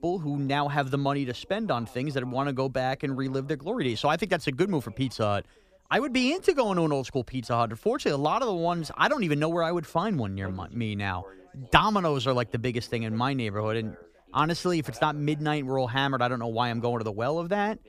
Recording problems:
background chatter; faint; throughout; 2 voices, 25 dB below the speech

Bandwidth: 15 kHz